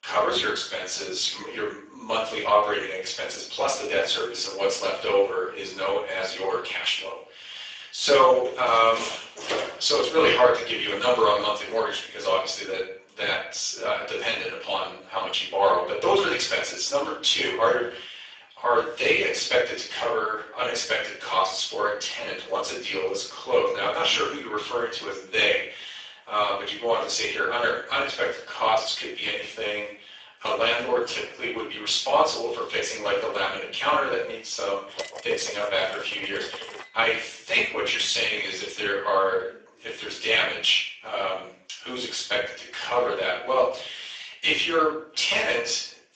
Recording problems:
off-mic speech; far
garbled, watery; badly; nothing above 7.5 kHz
thin; very; fading below 400 Hz
room echo; noticeable; dies away in 0.5 s
door banging; noticeable; from 8.5 to 10 s; peak 4 dB below the speech
clattering dishes; noticeable; from 35 to 37 s; peak 10 dB below the speech

